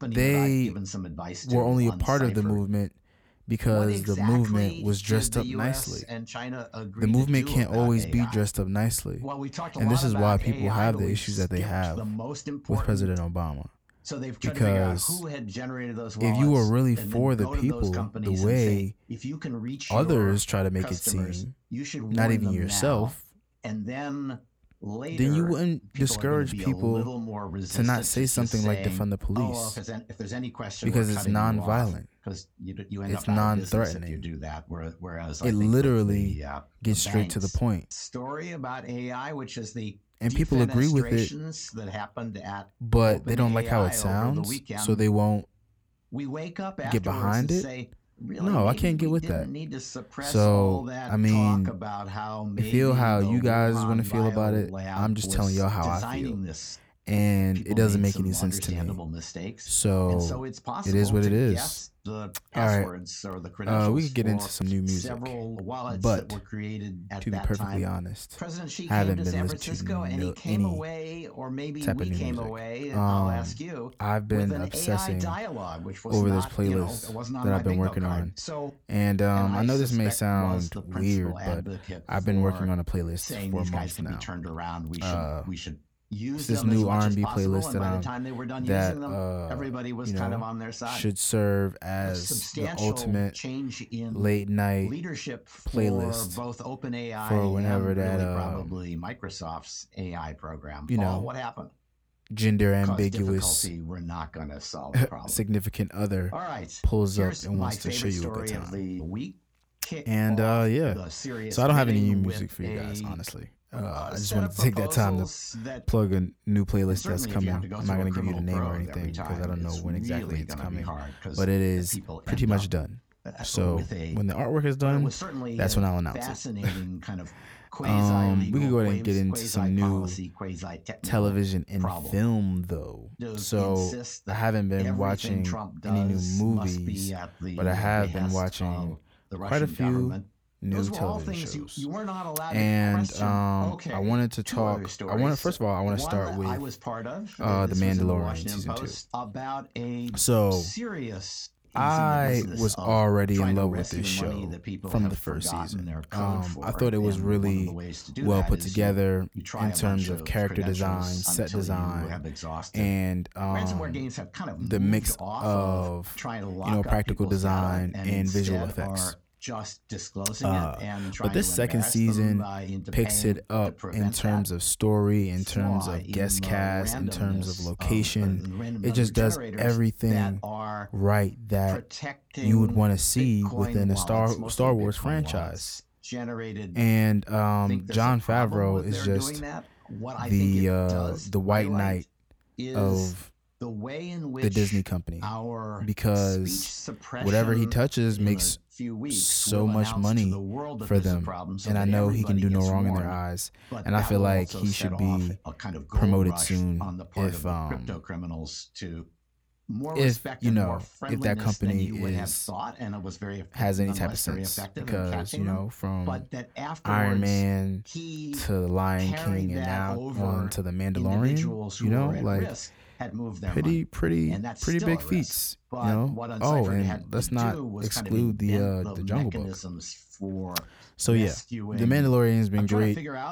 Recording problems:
voice in the background; loud; throughout; 9 dB below the speech

